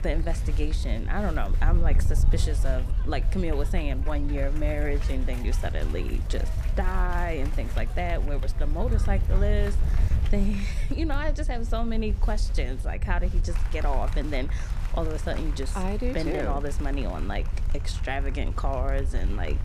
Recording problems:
crowd noise; noticeable; throughout; 15 dB below the speech
wind noise on the microphone; occasional gusts; 15 dB below the speech
voice in the background; faint; throughout; 30 dB below the speech

